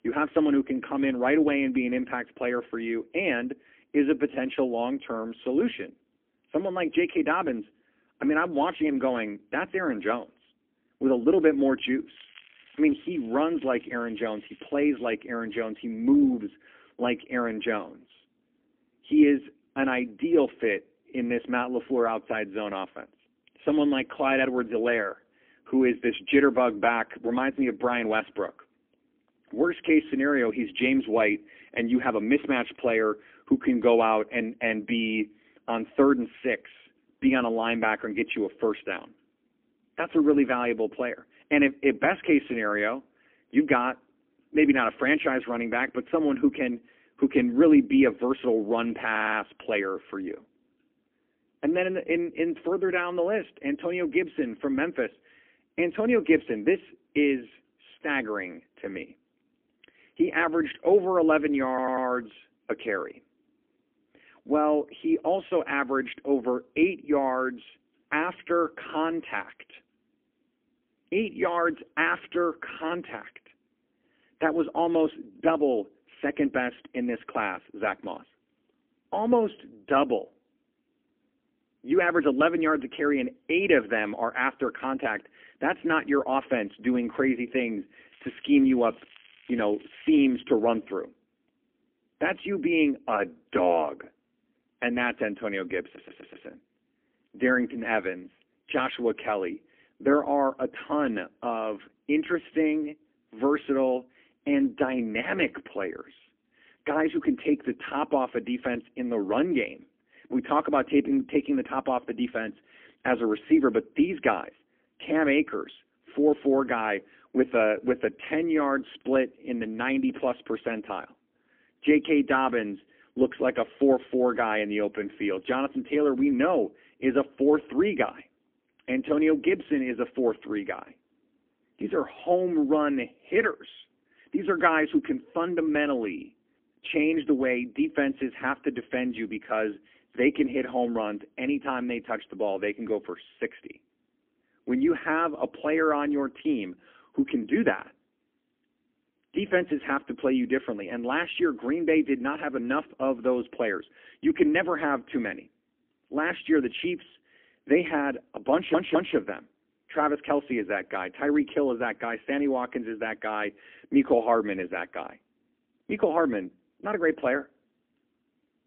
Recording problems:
phone-call audio; poor line; nothing above 3 kHz
crackling; faint; from 12 to 15 s and from 1:28 to 1:30; 25 dB below the speech
audio stuttering; 4 times, first at 49 s

